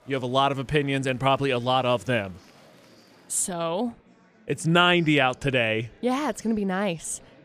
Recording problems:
murmuring crowd; faint; throughout; 30 dB below the speech

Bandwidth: 14.5 kHz